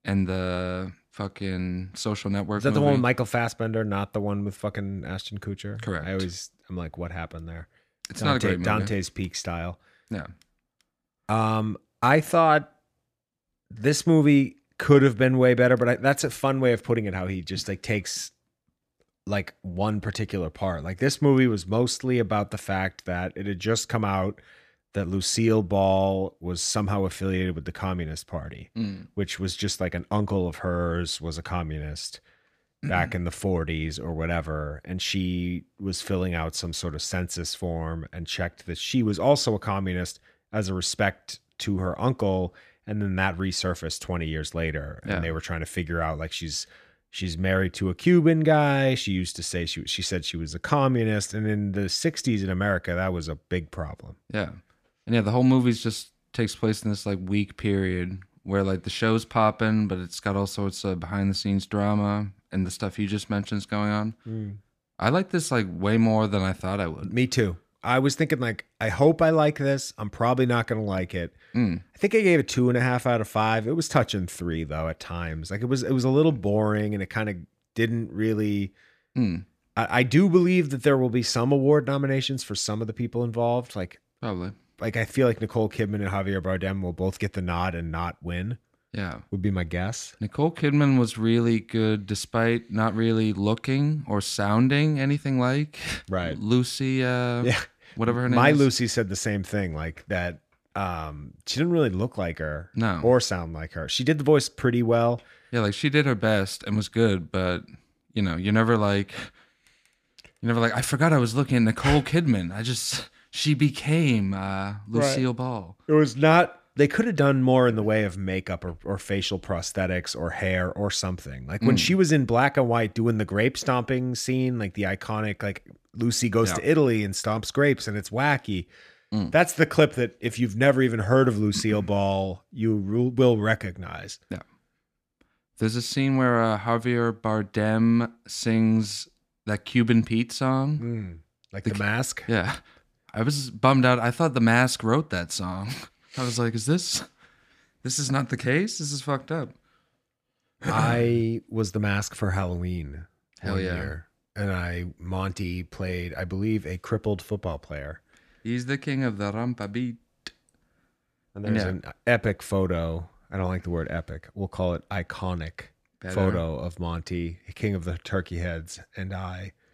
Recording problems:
none

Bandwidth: 14.5 kHz